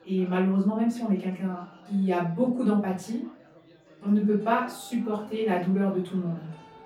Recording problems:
off-mic speech; far
room echo; slight; dies away in 0.4 s
background music; faint; throughout; 25 dB below the speech
chatter from many people; faint; throughout; 25 dB below the speech

